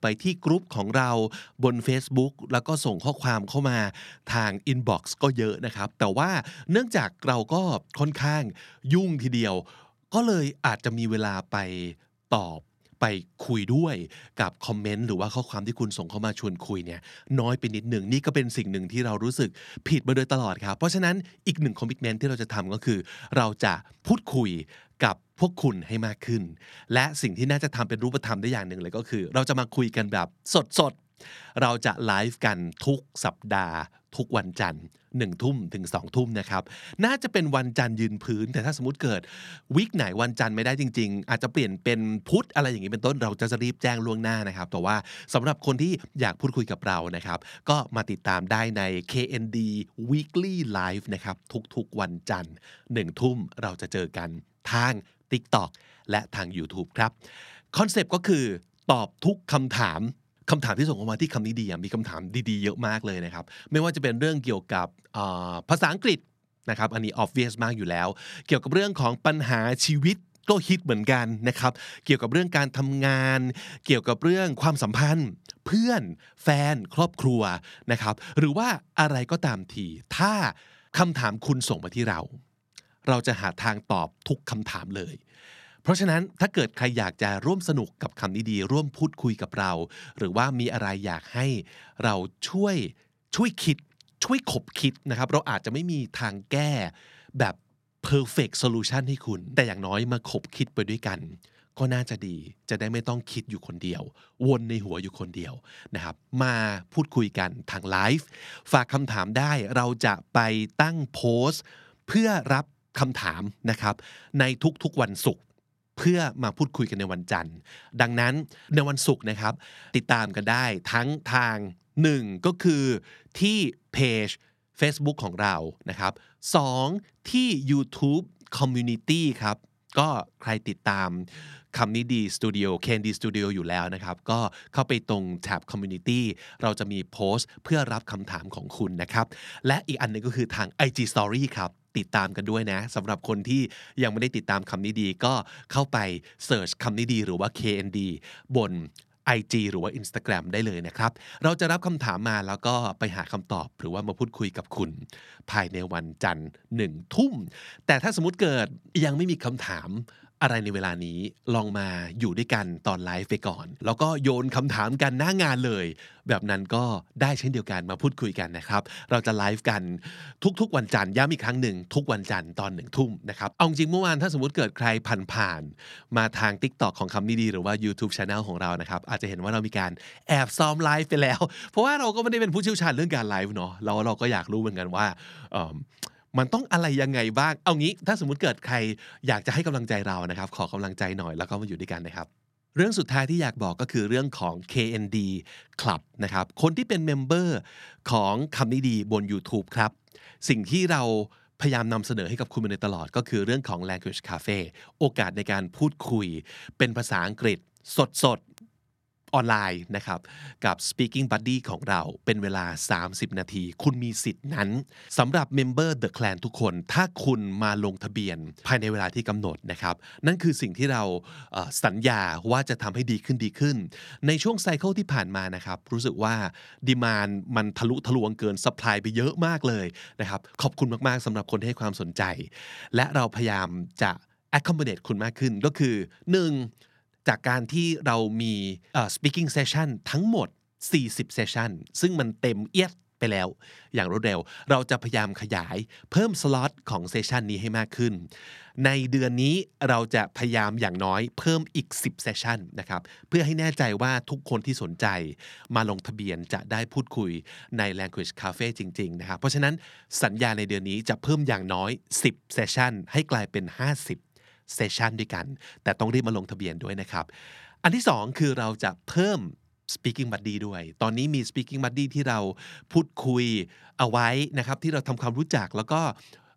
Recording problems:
none

